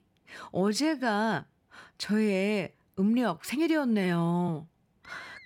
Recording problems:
background music; very faint; from 4 s on; 25 dB below the speech
uneven, jittery; strongly; from 0.5 to 4.5 s

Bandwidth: 17 kHz